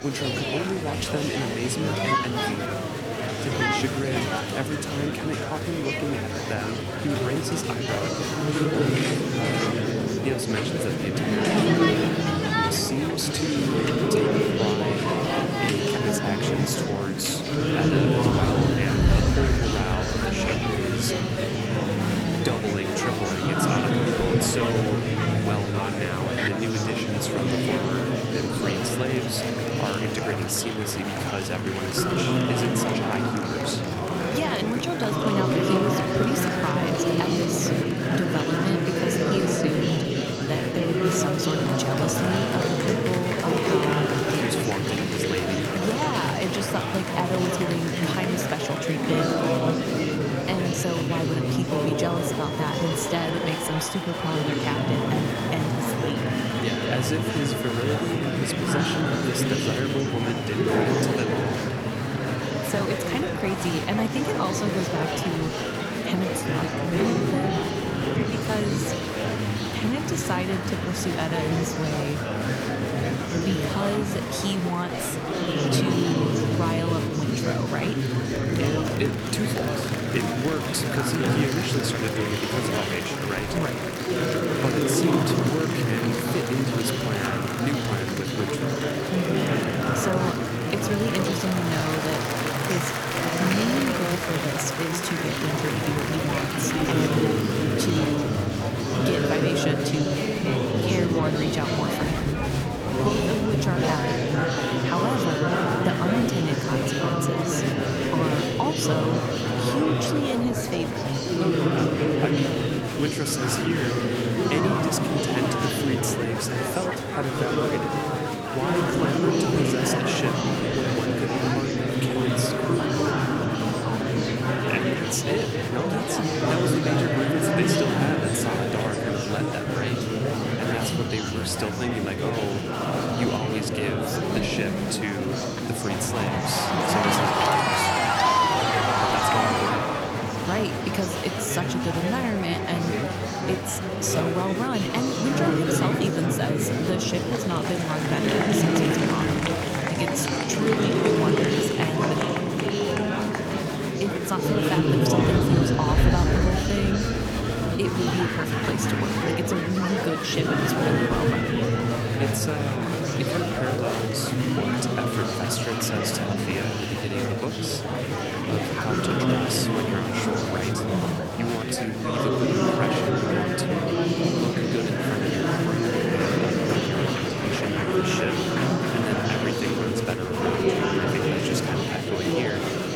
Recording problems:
murmuring crowd; very loud; throughout; 5 dB above the speech

